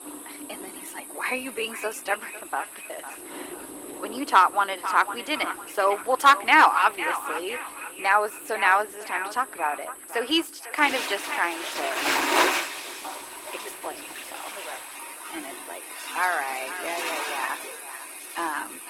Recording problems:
echo of what is said; strong; throughout; 500 ms later, 10 dB below the speech
thin; somewhat; fading below 300 Hz
garbled, watery; slightly; nothing above 16.5 kHz
rain or running water; loud; throughout; 5 dB below the speech
high-pitched whine; noticeable; throughout; 8 kHz, 15 dB below the speech

